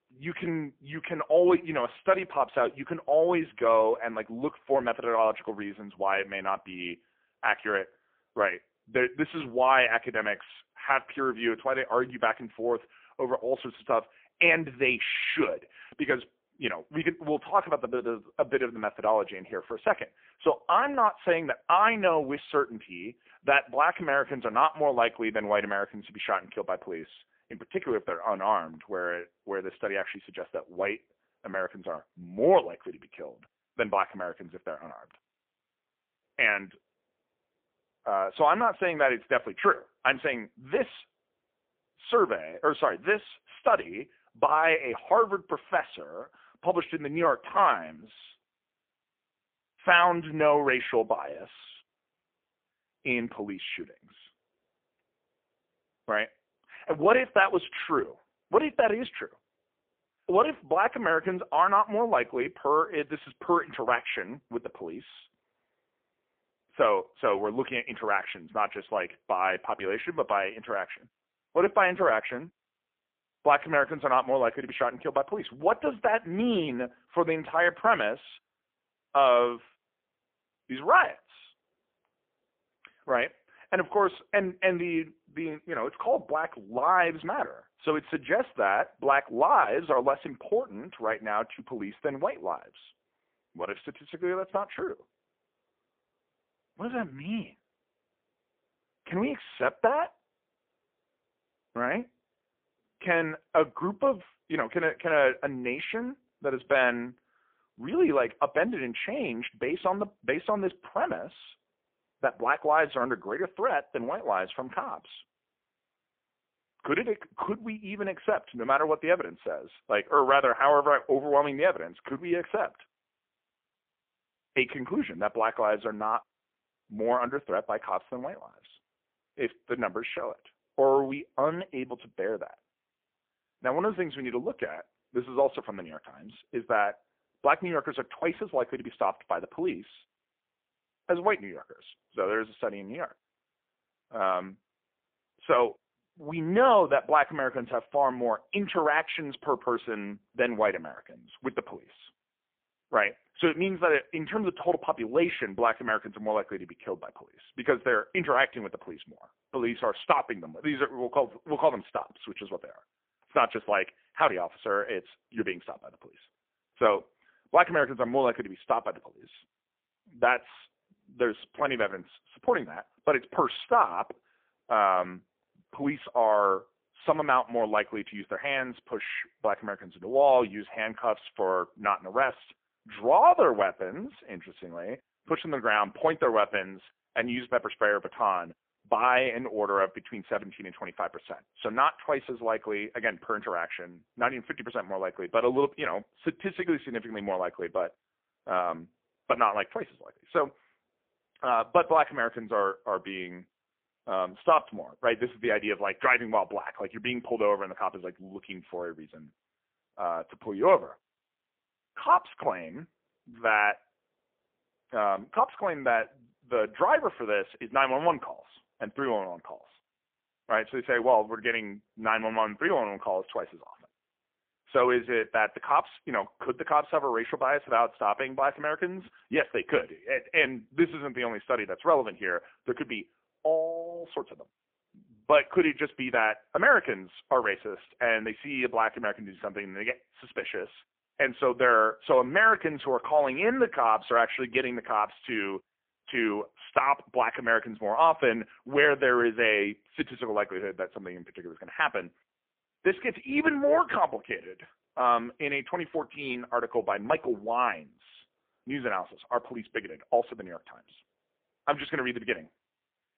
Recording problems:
phone-call audio; poor line

